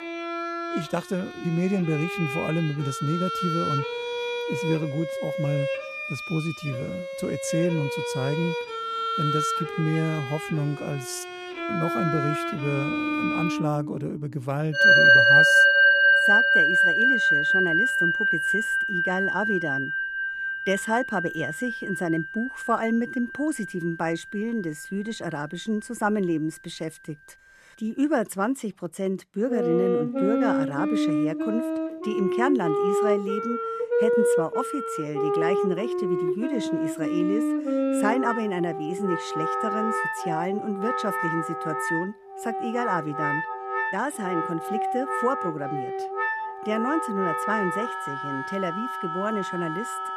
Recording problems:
background music; very loud; throughout; 5 dB above the speech

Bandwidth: 14 kHz